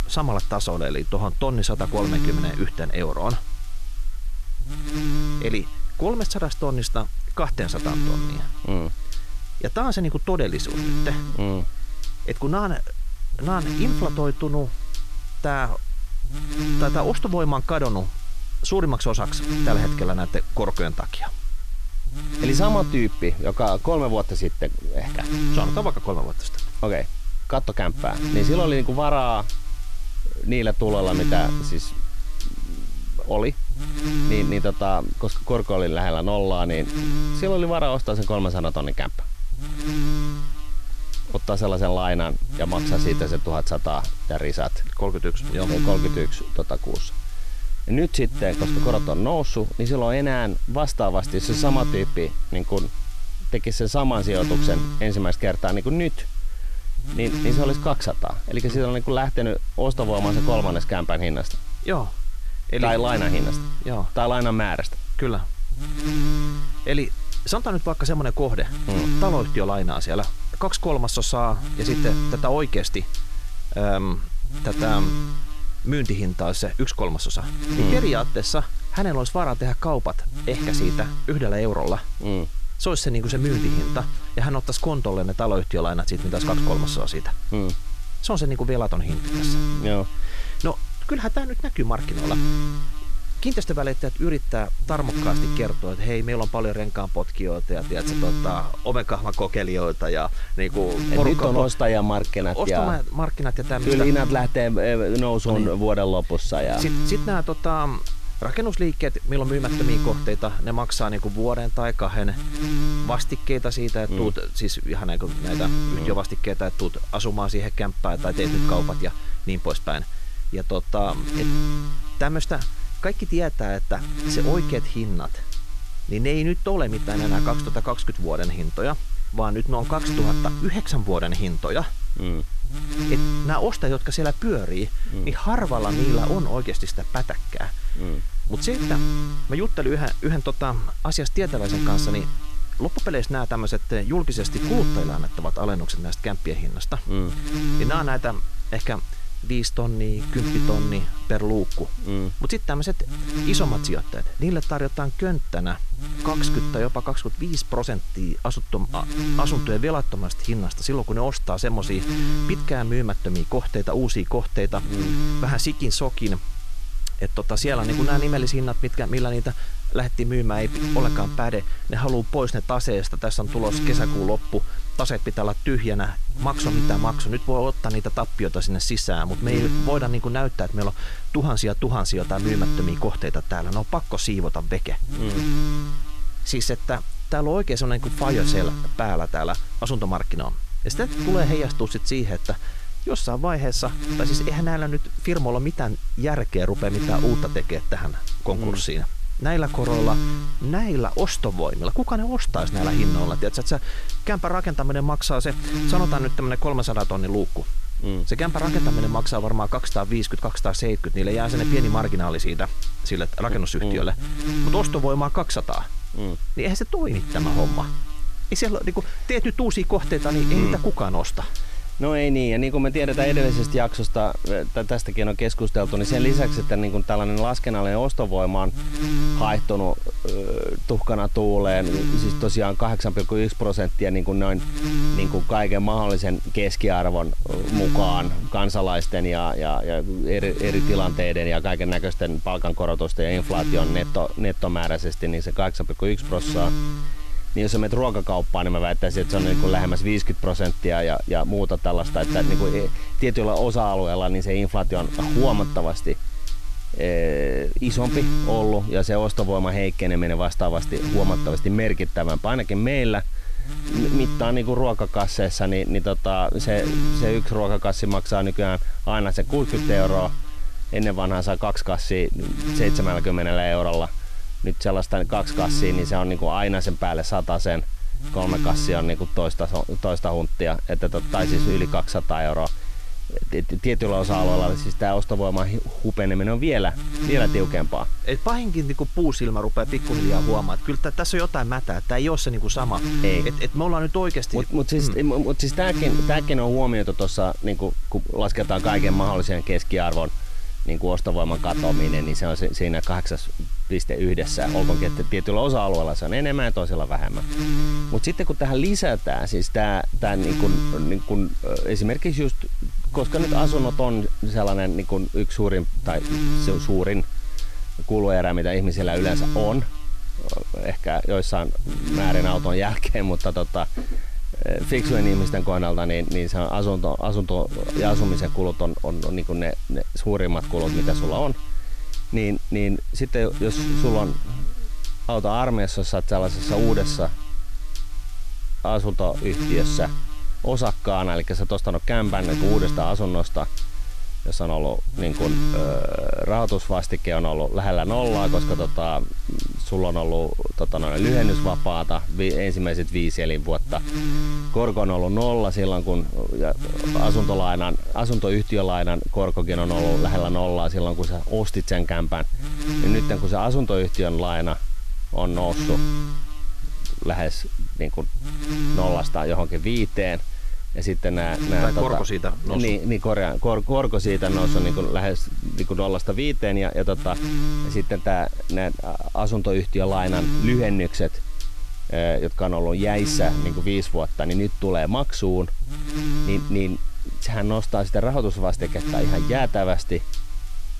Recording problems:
electrical hum; loud; throughout; 50 Hz, 9 dB below the speech

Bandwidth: 14 kHz